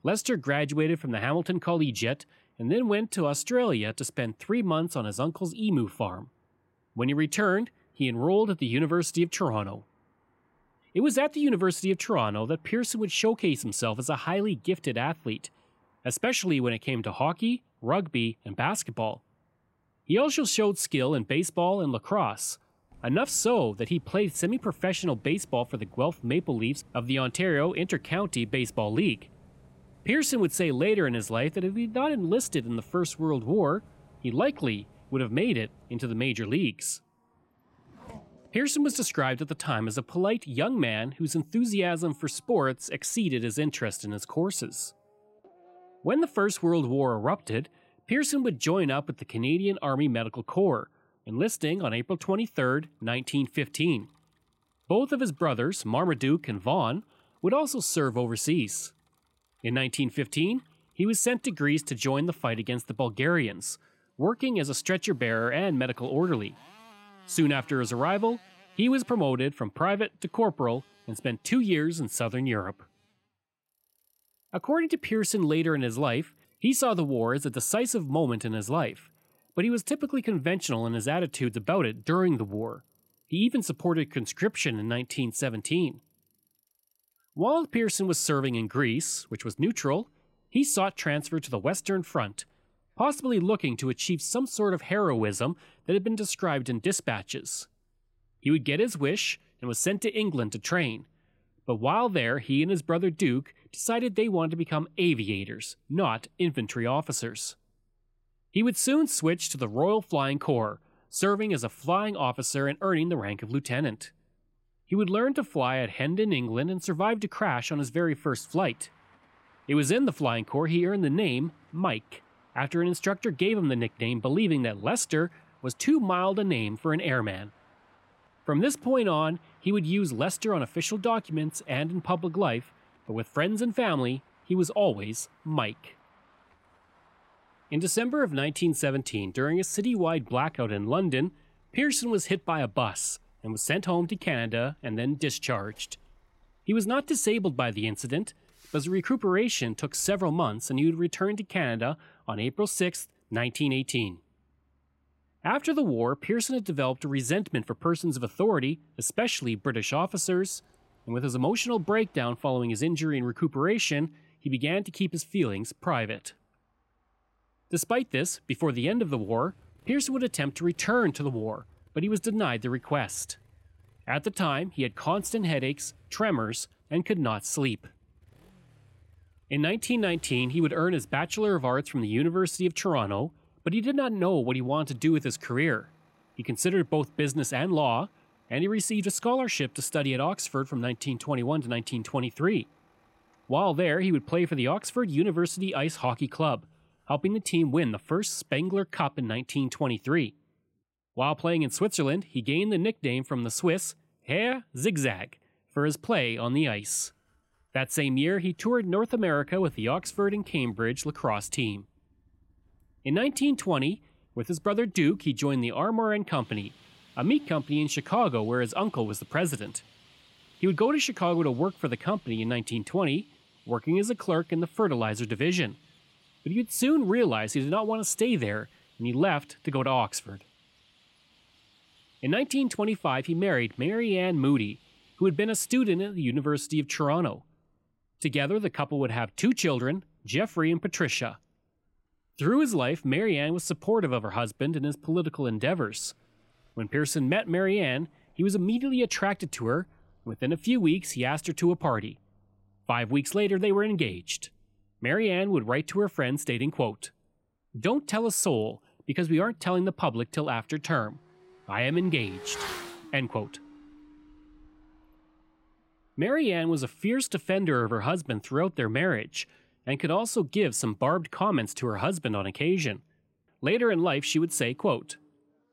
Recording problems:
traffic noise; faint; throughout; 30 dB below the speech

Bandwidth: 16 kHz